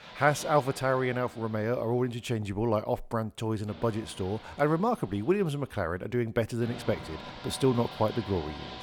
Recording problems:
machinery noise; noticeable; throughout; 15 dB below the speech

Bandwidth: 18.5 kHz